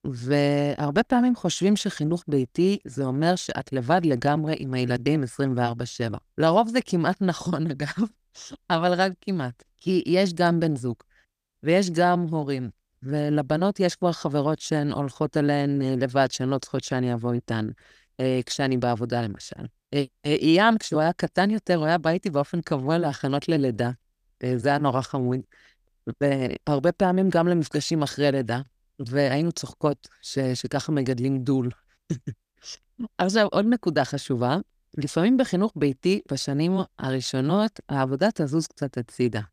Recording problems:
none

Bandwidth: 14.5 kHz